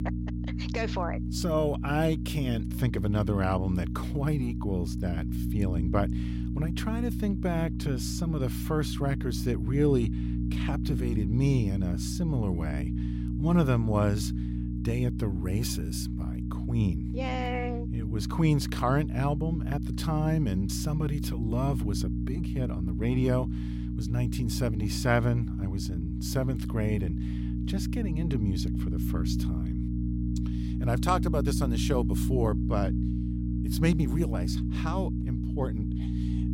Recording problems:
electrical hum; loud; throughout; 60 Hz, 7 dB below the speech

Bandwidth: 16 kHz